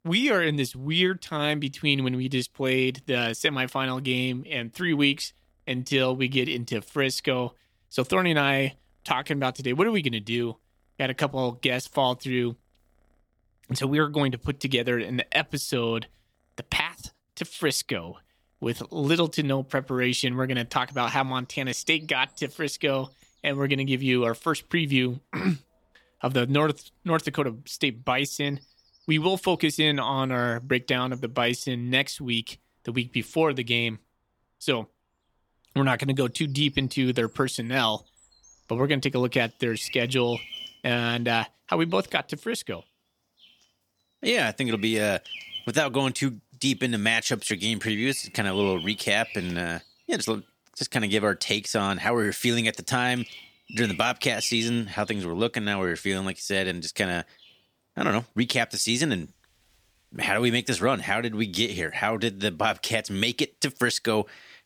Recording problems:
animal sounds; noticeable; throughout; 20 dB below the speech

